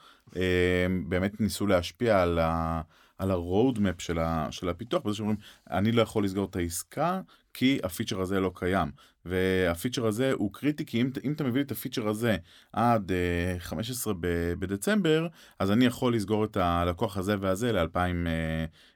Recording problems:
none

